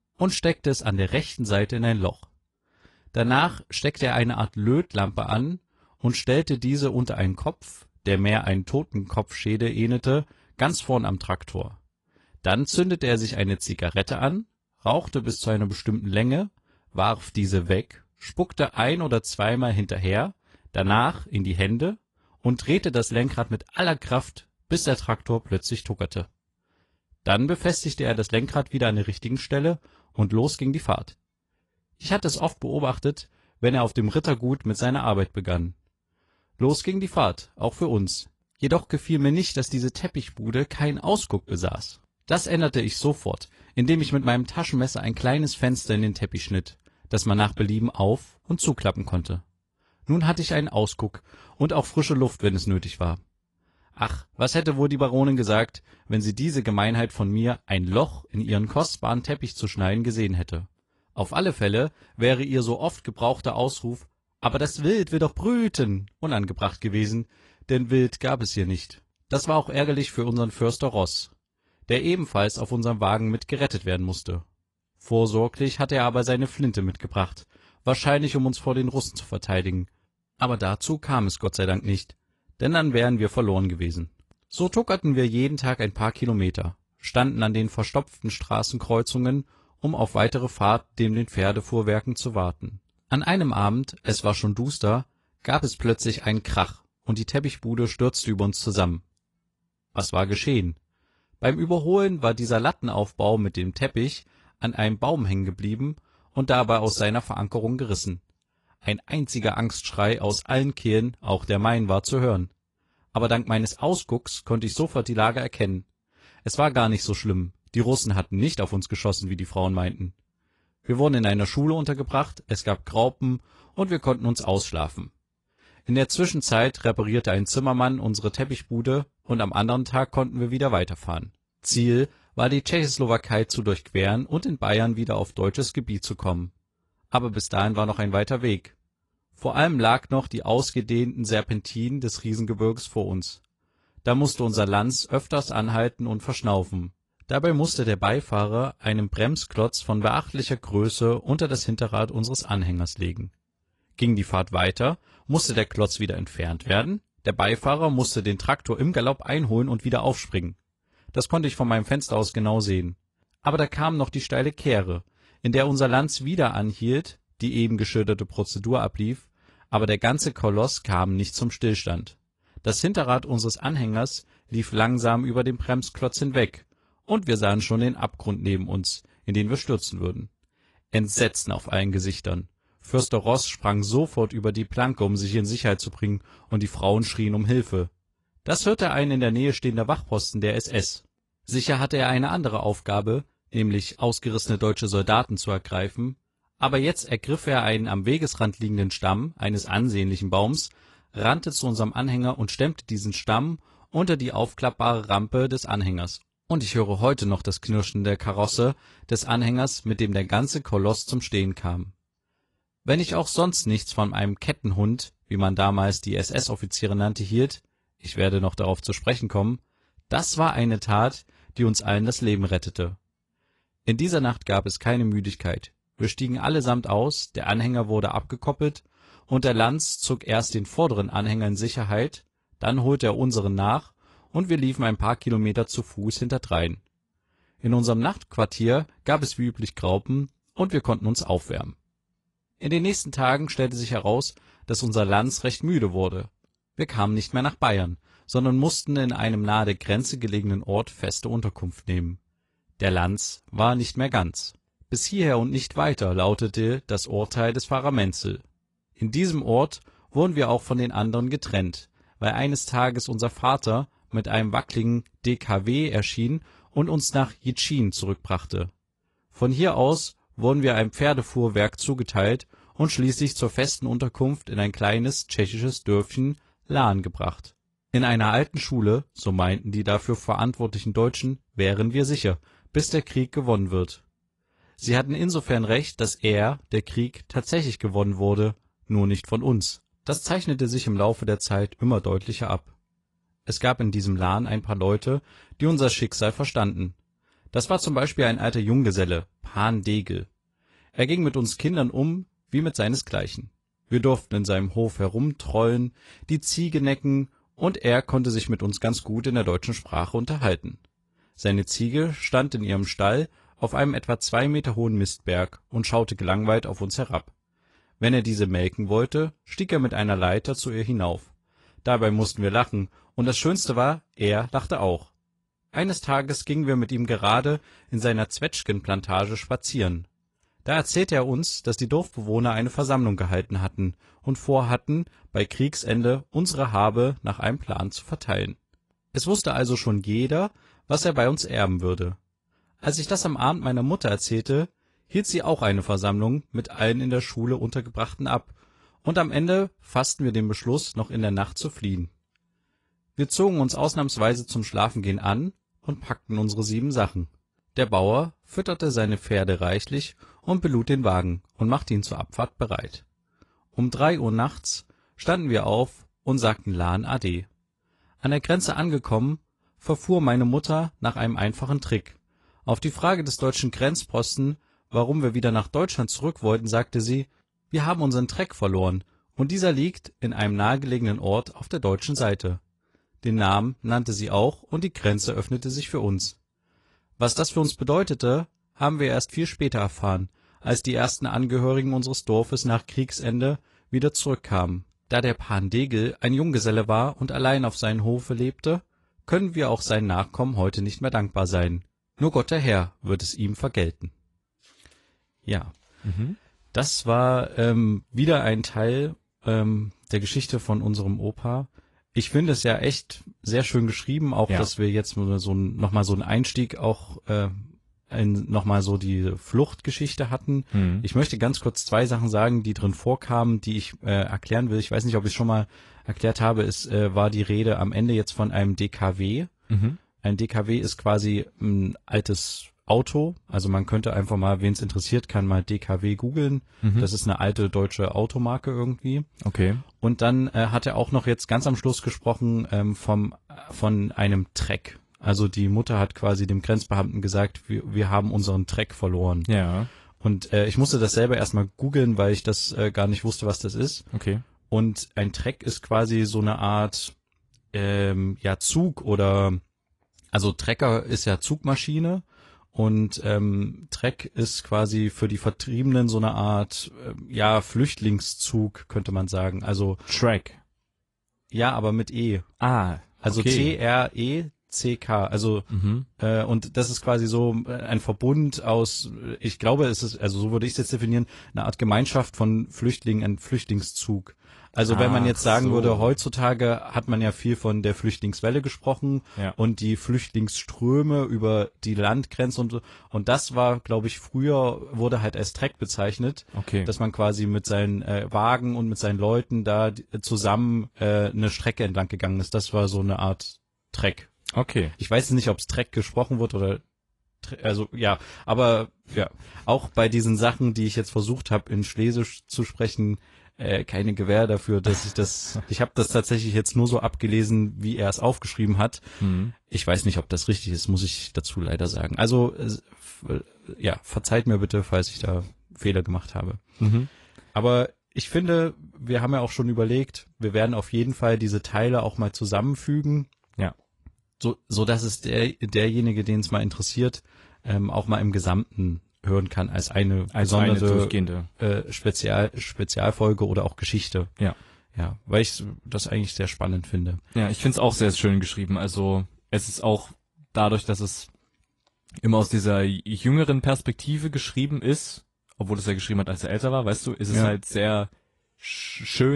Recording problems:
garbled, watery; slightly; nothing above 10.5 kHz
abrupt cut into speech; at the end

